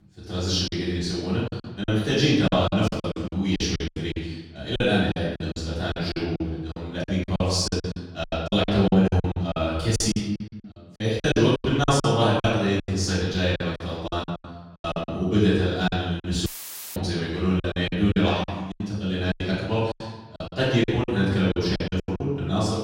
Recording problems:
off-mic speech; far
room echo; noticeable; dies away in 1 s
choppy; very; 15% of the speech affected
audio cutting out; filled with static; at 16 s for 0.5 s

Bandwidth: 16 kHz